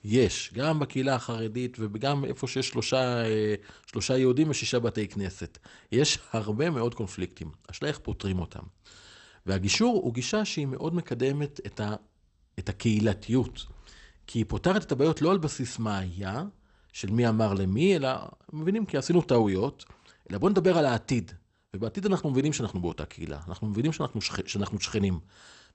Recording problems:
garbled, watery; slightly; nothing above 8 kHz

